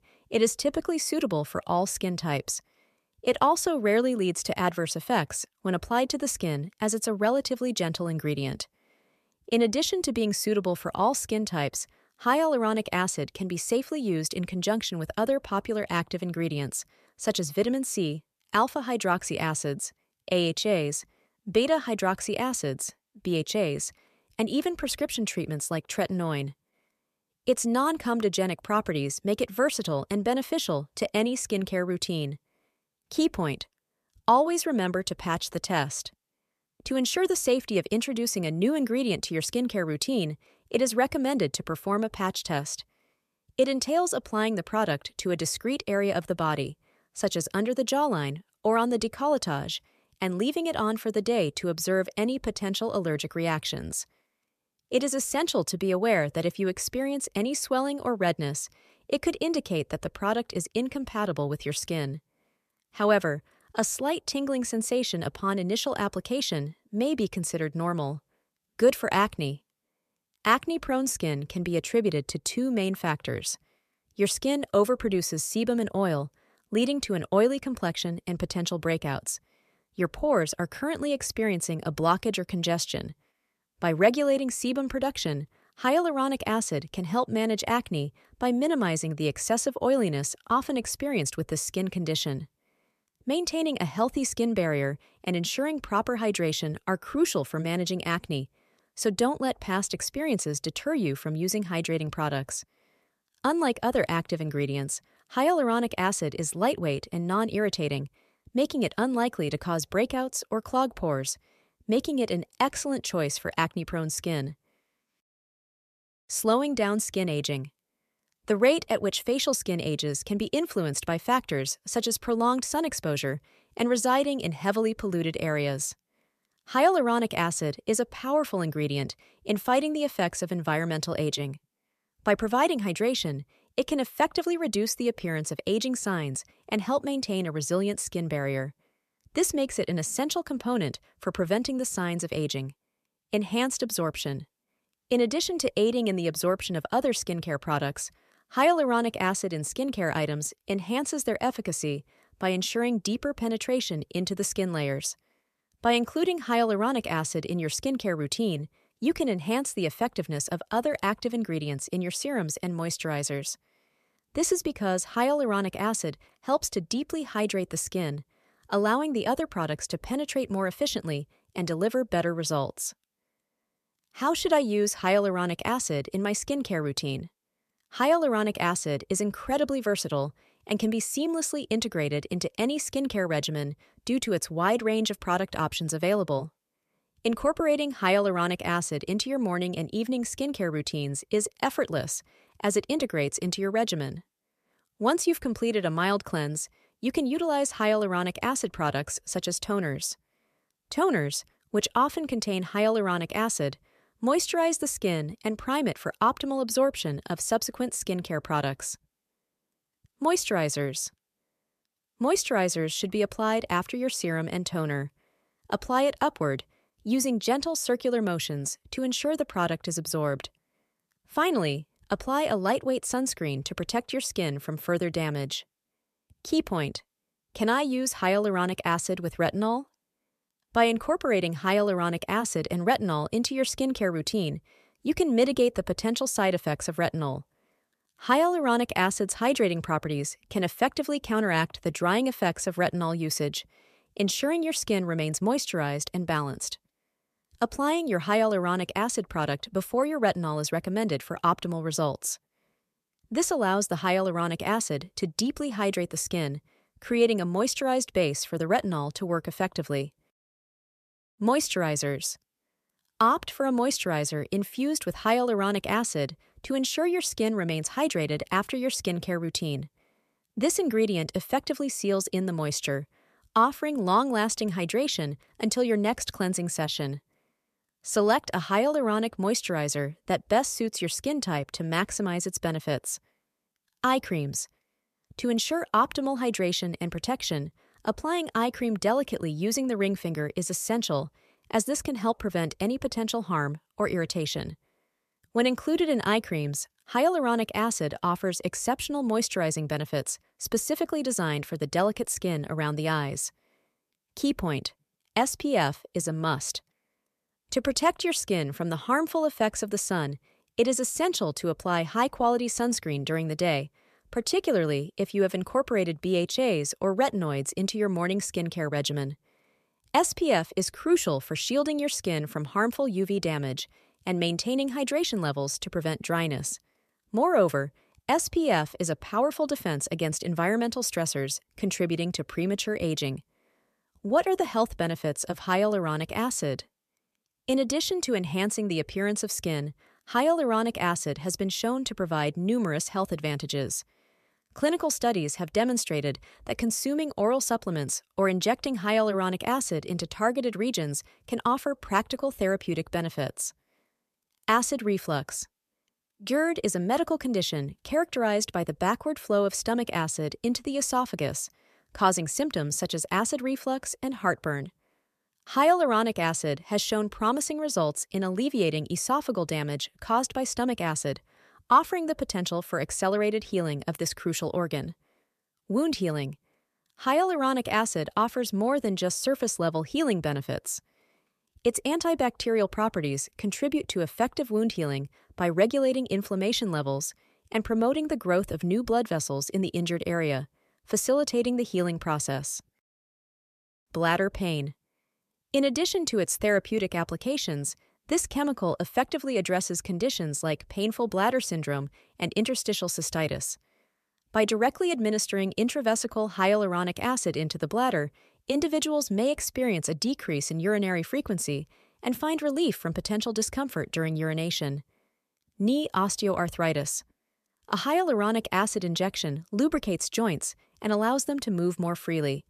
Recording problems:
none

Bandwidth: 14.5 kHz